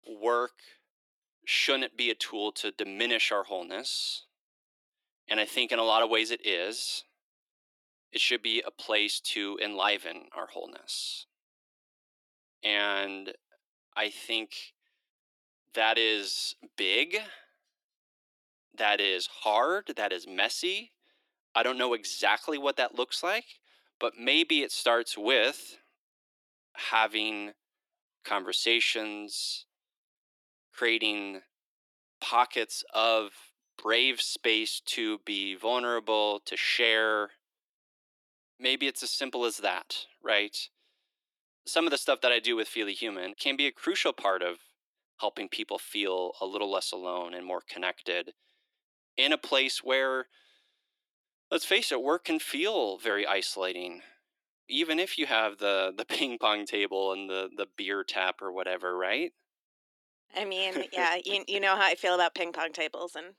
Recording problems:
thin; very; fading below 300 Hz

